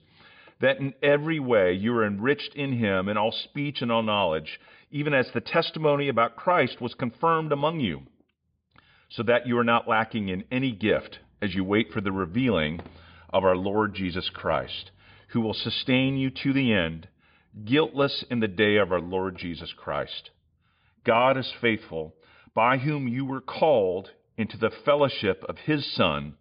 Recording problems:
high frequencies cut off; severe; nothing above 5 kHz

